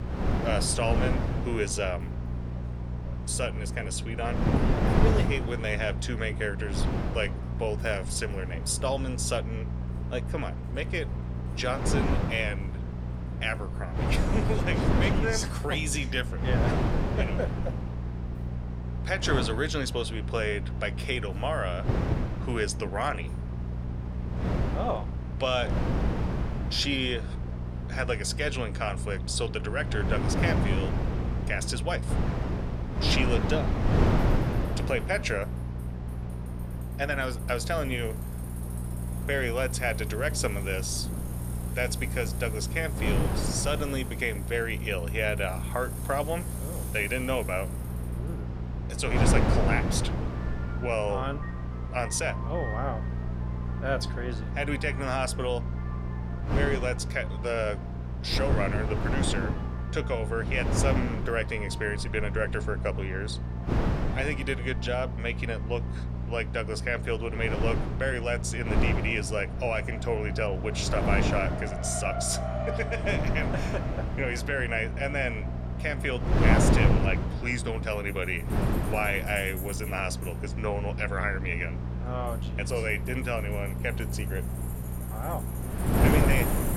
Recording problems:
wind noise on the microphone; heavy; 6 dB below the speech
electrical hum; noticeable; throughout; 60 Hz, 15 dB below the speech
traffic noise; noticeable; throughout; 15 dB below the speech

